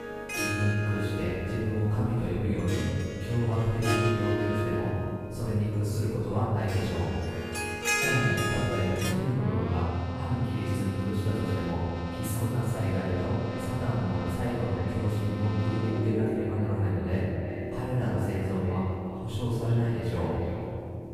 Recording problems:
room echo; strong; dies away in 2.1 s
off-mic speech; far
echo of what is said; faint; from 13 s on; 360 ms later, 20 dB below the speech
background music; loud; throughout; 5 dB below the speech
electrical hum; faint; throughout; 50 Hz, 20 dB below the speech

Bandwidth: 15 kHz